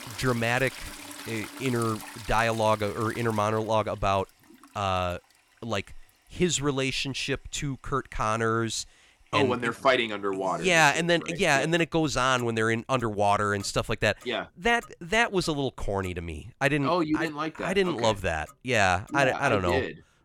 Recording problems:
household noises; noticeable; throughout; 20 dB below the speech

